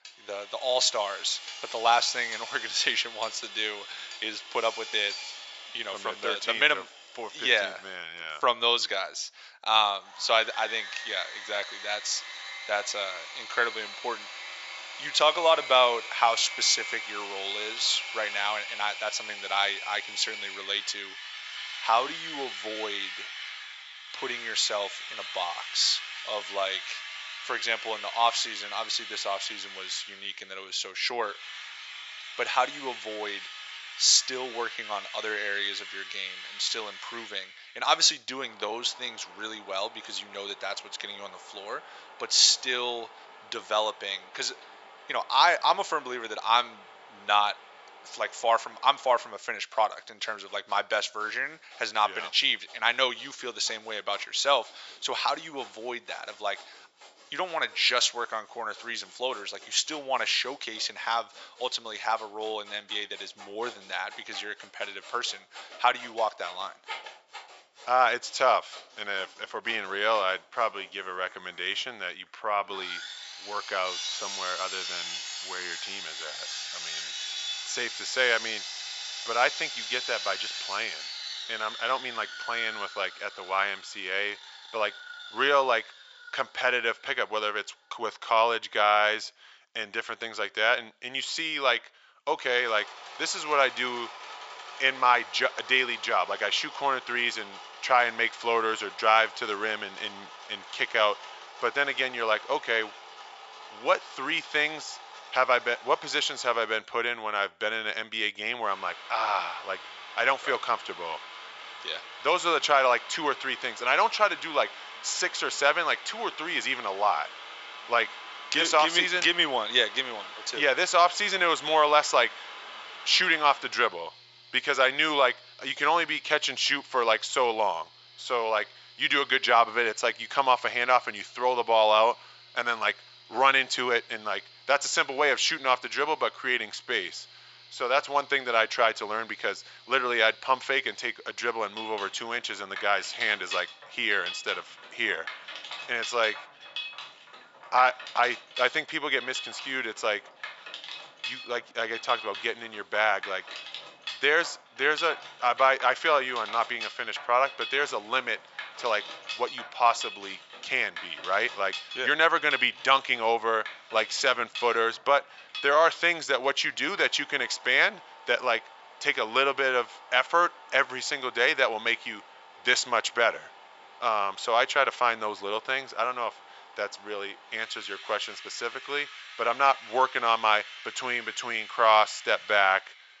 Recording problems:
thin; very; fading below 900 Hz
high frequencies cut off; noticeable; nothing above 8 kHz
machinery noise; noticeable; throughout; 15 dB below the speech

